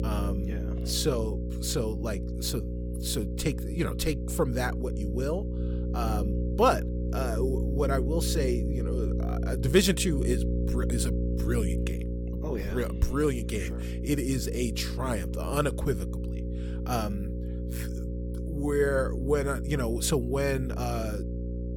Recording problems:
electrical hum; loud; throughout; 60 Hz, 9 dB below the speech

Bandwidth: 18 kHz